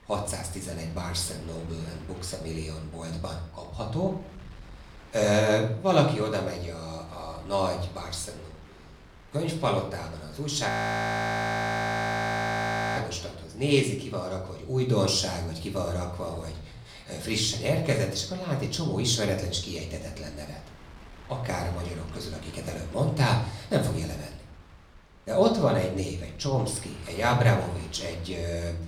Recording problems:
room echo; slight; dies away in 0.5 s
off-mic speech; somewhat distant
wind noise on the microphone; occasional gusts; 25 dB below the speech
audio freezing; at 11 s for 2.5 s

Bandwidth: 18.5 kHz